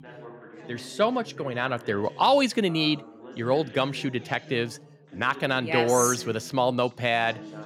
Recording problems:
background chatter; noticeable; throughout; 3 voices, 20 dB below the speech

